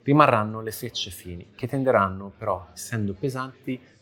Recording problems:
chatter from many people; faint; throughout; 30 dB below the speech

